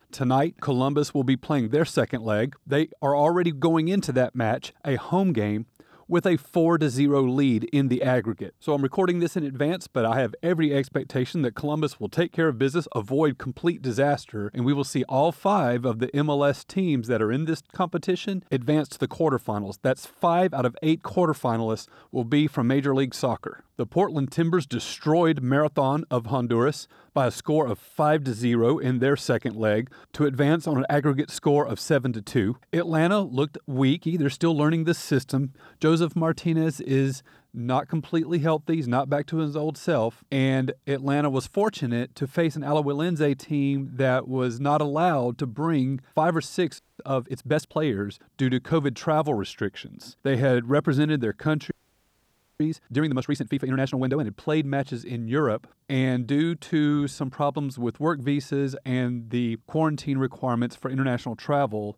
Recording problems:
audio freezing; at 47 s and at 52 s for 1 s

